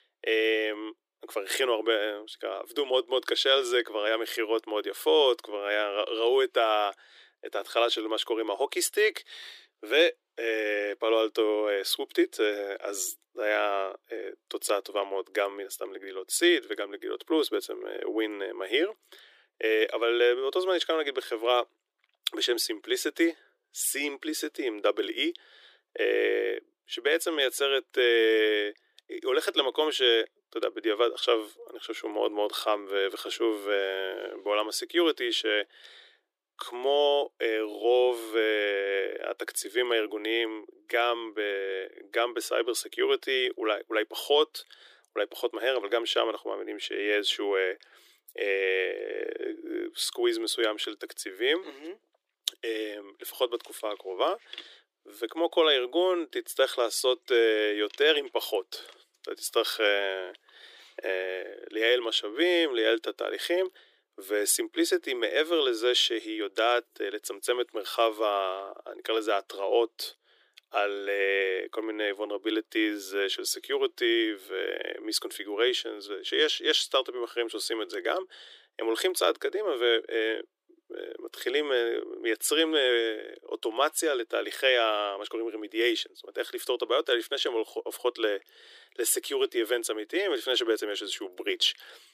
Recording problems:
thin; very; fading below 300 Hz

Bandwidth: 15 kHz